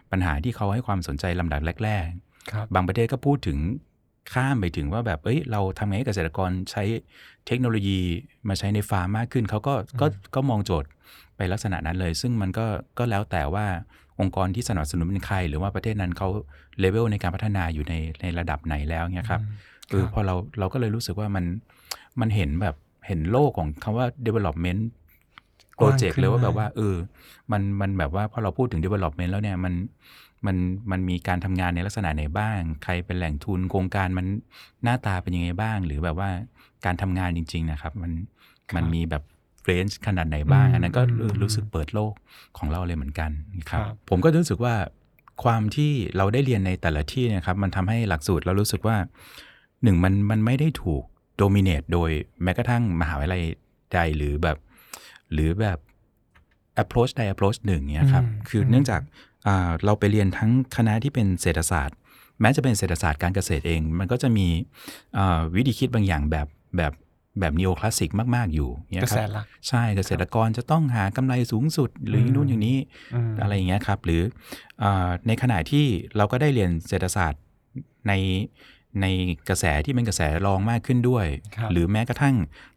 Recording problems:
none

